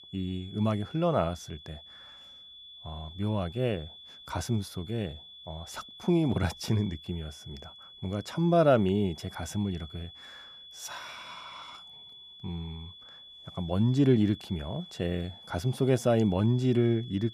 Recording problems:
high-pitched whine; noticeable; throughout; 3.5 kHz, 20 dB below the speech

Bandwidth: 14.5 kHz